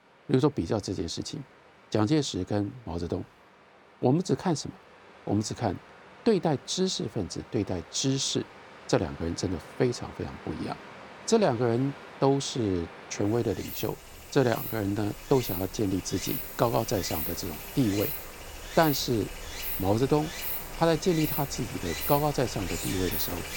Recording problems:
rain or running water; loud; throughout; 7 dB below the speech

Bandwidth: 18.5 kHz